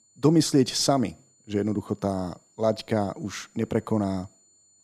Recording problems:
high-pitched whine; faint; throughout; 7 kHz, 35 dB below the speech

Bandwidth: 15 kHz